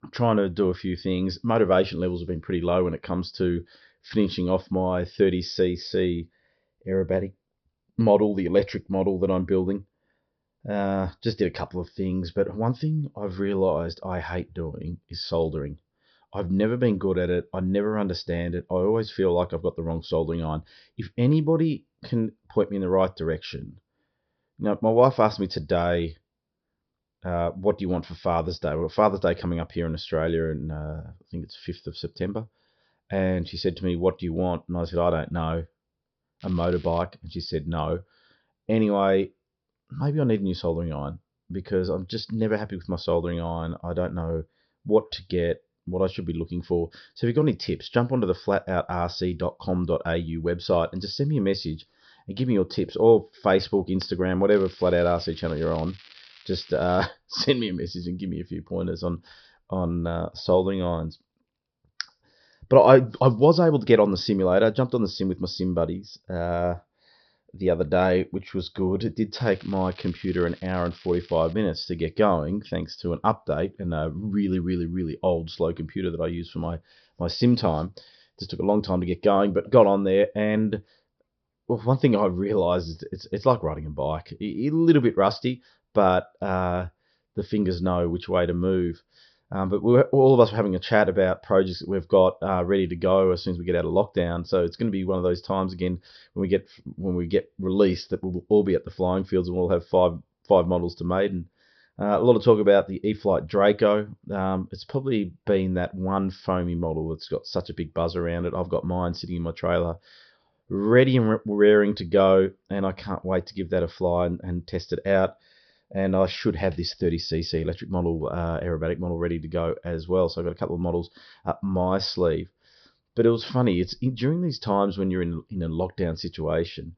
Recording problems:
high frequencies cut off; noticeable; nothing above 5.5 kHz
crackling; faint; at 36 s, from 55 to 57 s and from 1:09 to 1:12; 25 dB below the speech

